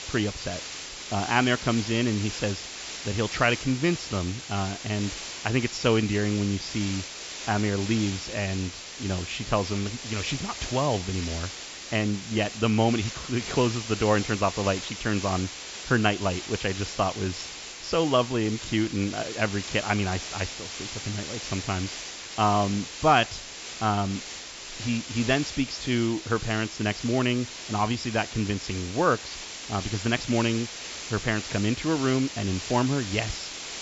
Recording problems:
high frequencies cut off; noticeable; nothing above 8 kHz
hiss; loud; throughout; 8 dB below the speech

